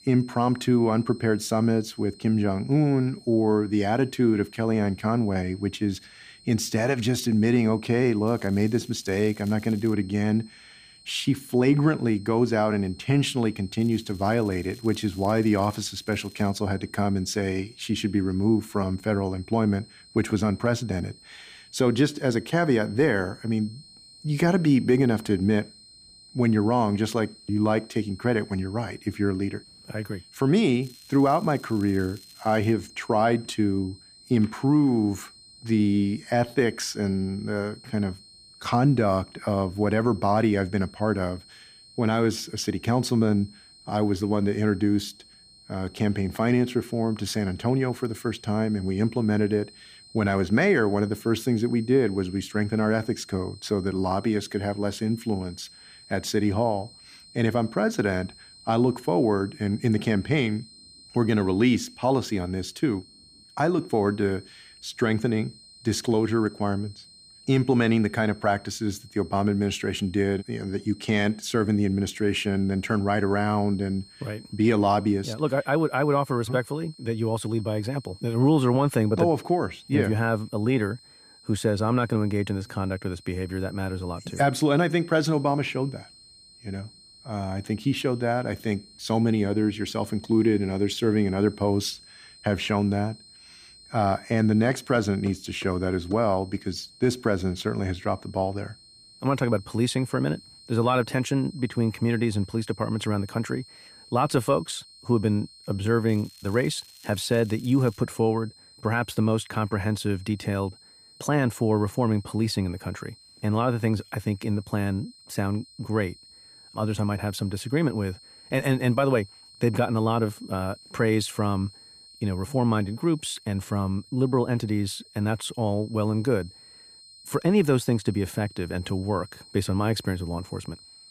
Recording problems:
high-pitched whine; faint; throughout; 4 kHz, 25 dB below the speech
crackling; faint; 4 times, first at 8.5 s; 25 dB below the speech

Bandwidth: 15 kHz